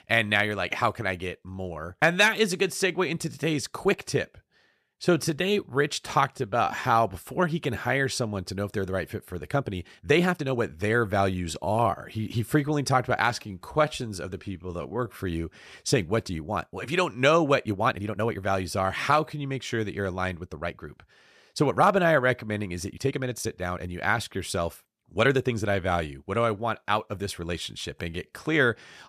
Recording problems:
uneven, jittery; strongly; from 1.5 to 28 s

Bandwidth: 14.5 kHz